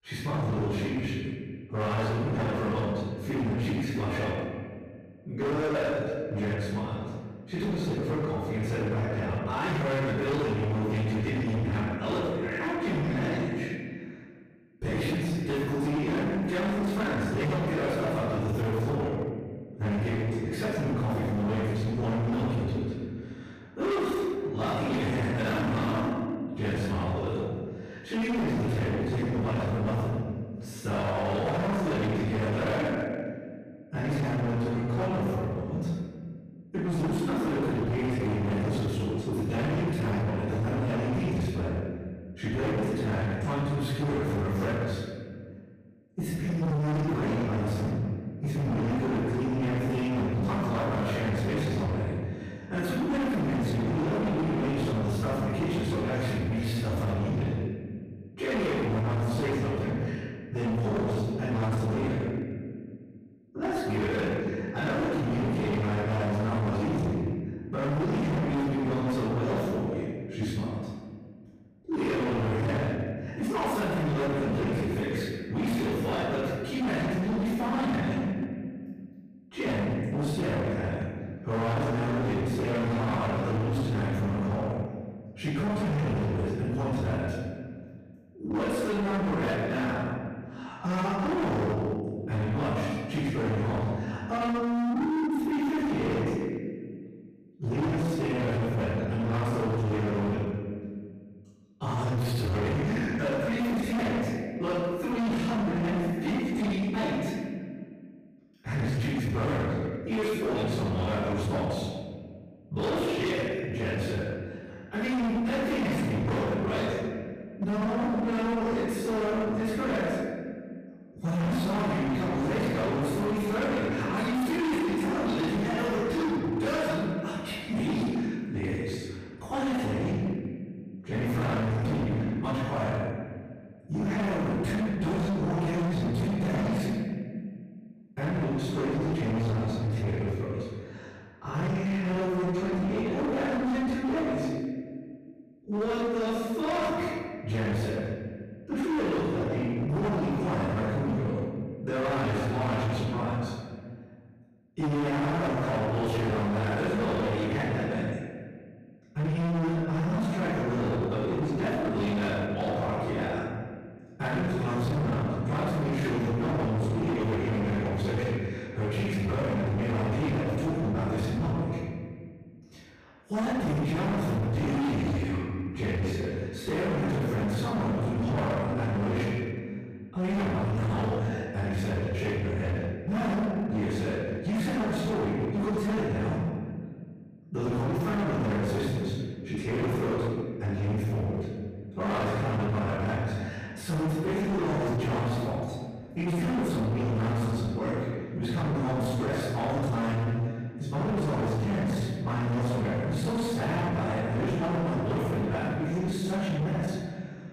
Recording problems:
distortion; heavy; 31% of the sound clipped
room echo; strong; dies away in 1.6 s
off-mic speech; far

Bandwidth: 14.5 kHz